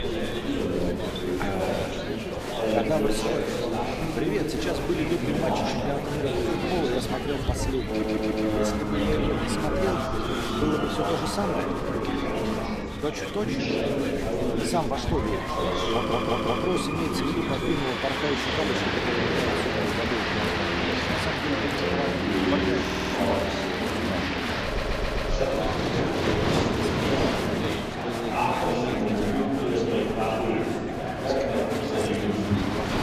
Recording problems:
rain or running water; very loud; throughout; as loud as the speech
murmuring crowd; very loud; throughout; 4 dB above the speech
audio stuttering; 4 times, first at 8 s

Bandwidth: 14.5 kHz